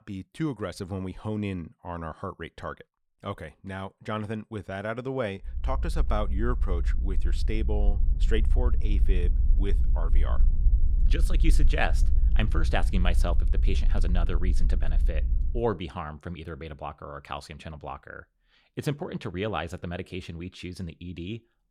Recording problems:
low rumble; noticeable; from 5.5 to 16 s; 15 dB below the speech

